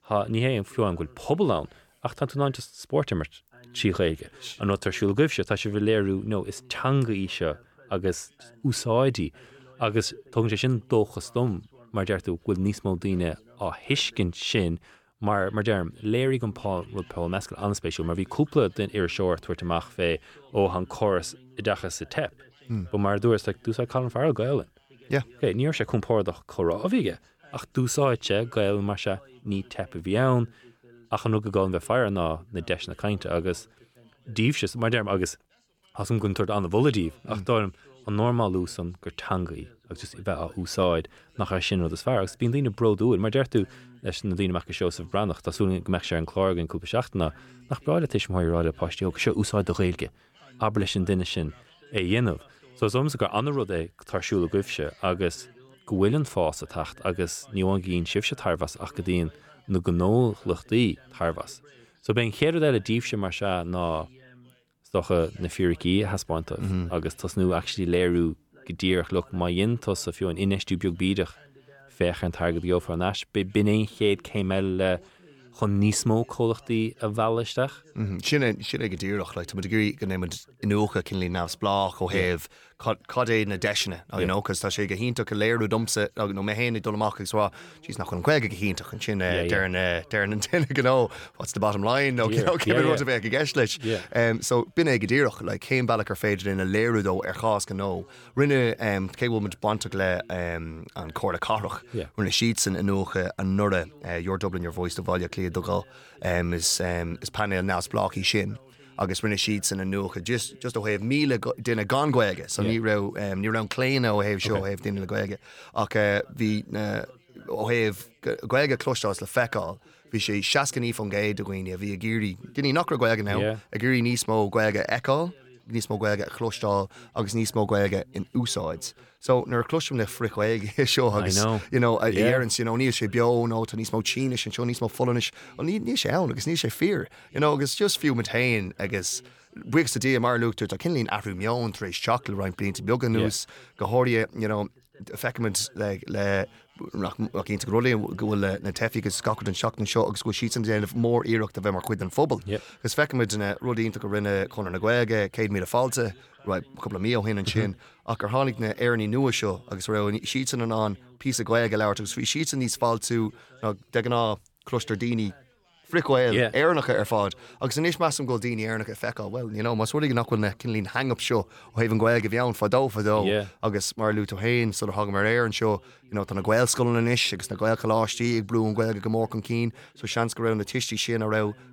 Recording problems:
background chatter; faint; throughout; 2 voices, 30 dB below the speech

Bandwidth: 18.5 kHz